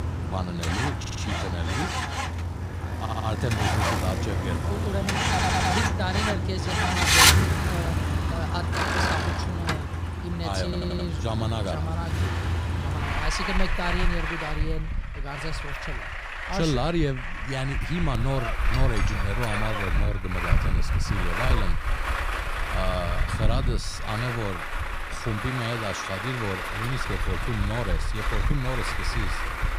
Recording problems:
traffic noise; very loud; throughout; 5 dB above the speech
audio stuttering; 4 times, first at 1 s

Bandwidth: 15.5 kHz